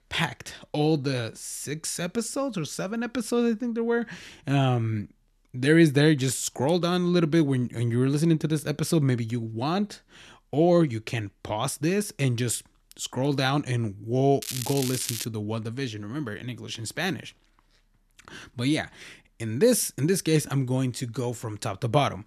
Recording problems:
crackling; loud; at 14 s; 7 dB below the speech

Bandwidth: 13.5 kHz